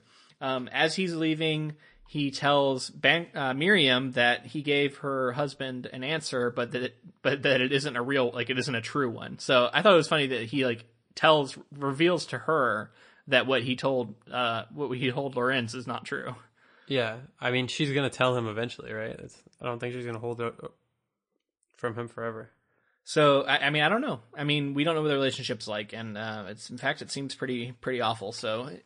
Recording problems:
garbled, watery; slightly; nothing above 9 kHz

